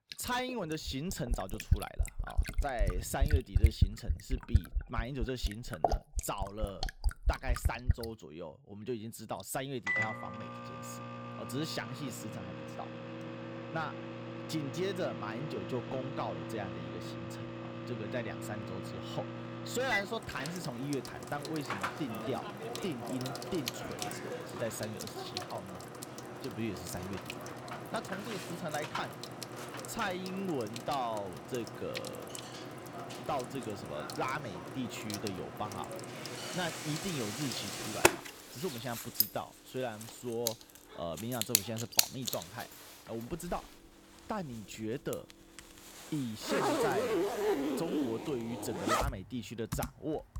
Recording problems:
household noises; very loud; throughout; 2 dB above the speech

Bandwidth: 18 kHz